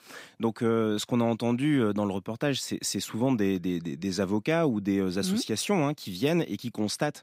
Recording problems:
none

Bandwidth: 15.5 kHz